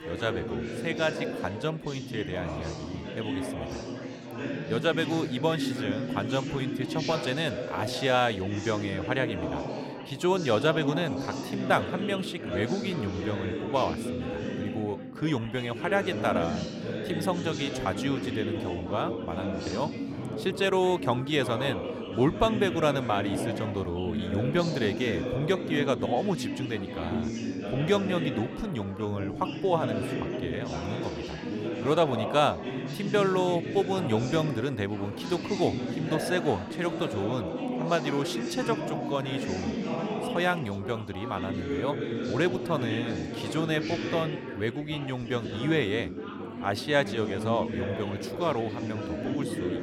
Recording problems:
chatter from many people; loud; throughout; 4 dB below the speech

